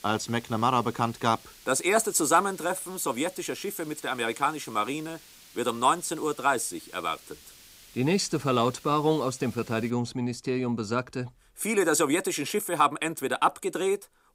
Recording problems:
hiss; faint; until 10 s; 20 dB below the speech

